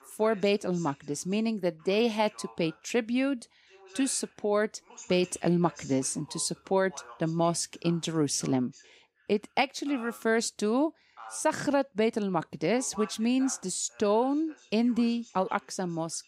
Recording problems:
voice in the background; faint; throughout; 20 dB below the speech

